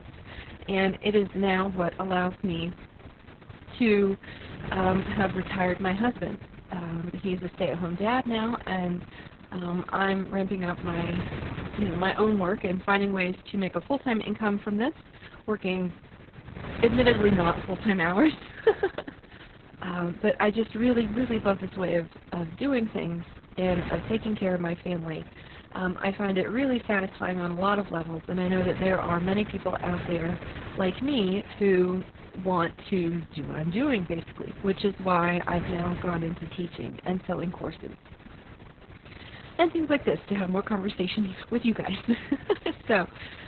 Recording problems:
garbled, watery; badly; nothing above 4 kHz
wind noise on the microphone; occasional gusts; 15 dB below the speech

